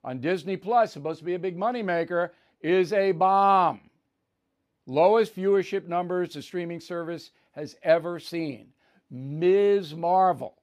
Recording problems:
none

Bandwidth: 15 kHz